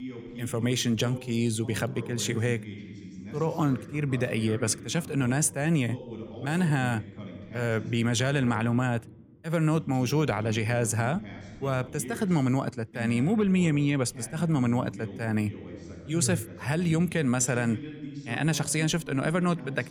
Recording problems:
voice in the background; noticeable; throughout; 15 dB below the speech

